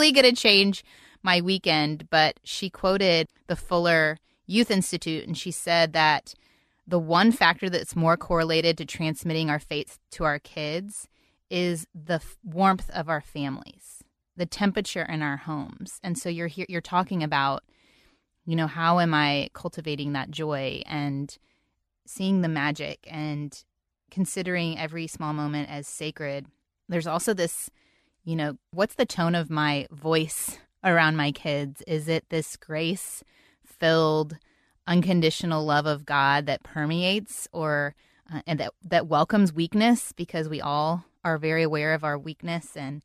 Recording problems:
abrupt cut into speech; at the start

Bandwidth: 13.5 kHz